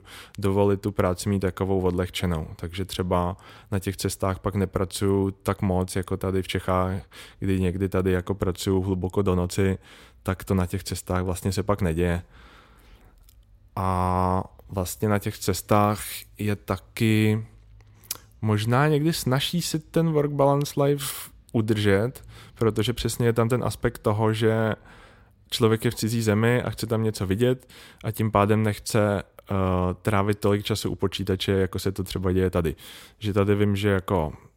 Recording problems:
none

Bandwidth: 16 kHz